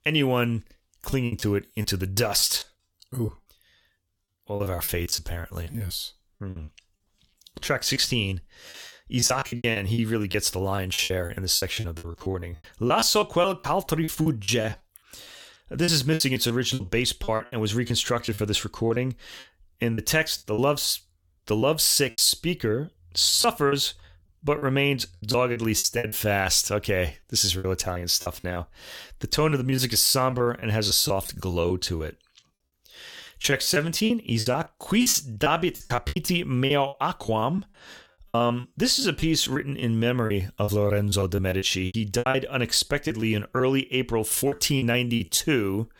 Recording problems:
choppy; very; 15% of the speech affected

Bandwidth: 17.5 kHz